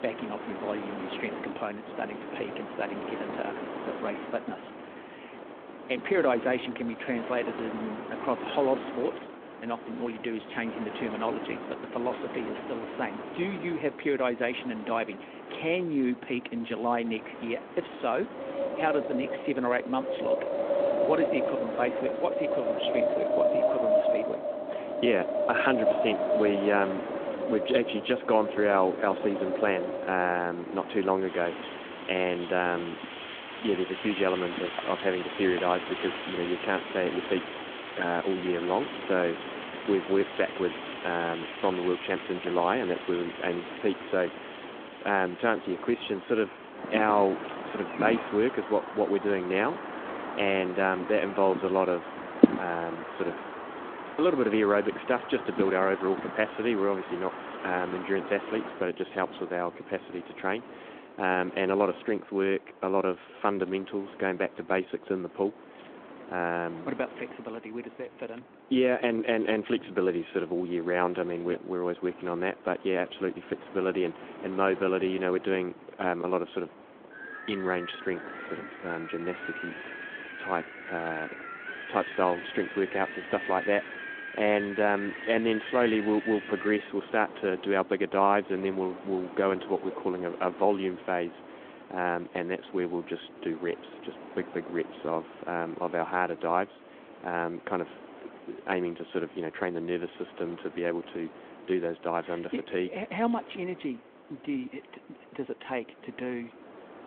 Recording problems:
phone-call audio
wind in the background; loud; throughout; 5 dB below the speech

